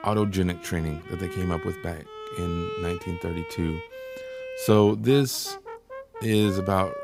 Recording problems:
background music; noticeable; throughout; 10 dB below the speech

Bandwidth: 15.5 kHz